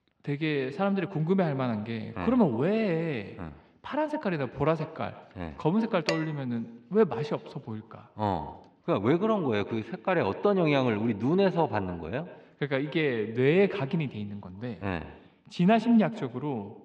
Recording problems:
echo of what is said; noticeable; throughout; 120 ms later, 15 dB below the speech
muffled; slightly; fading above 3.5 kHz
clattering dishes; noticeable; at 6 s; peak 5 dB below the speech

